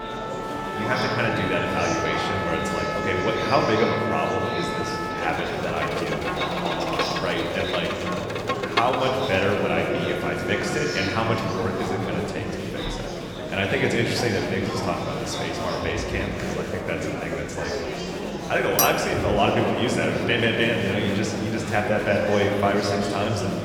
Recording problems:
room echo; noticeable; dies away in 2.7 s
off-mic speech; somewhat distant
background music; loud; until 11 s; 6 dB below the speech
murmuring crowd; loud; throughout; 5 dB below the speech
clattering dishes; loud; at 19 s; peak 2 dB above the speech

